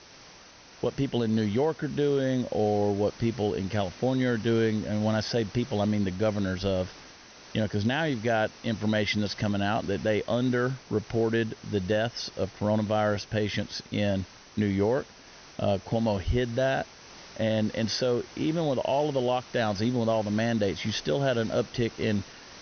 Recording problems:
high frequencies cut off; noticeable; nothing above 6 kHz
hiss; noticeable; throughout; 20 dB below the speech

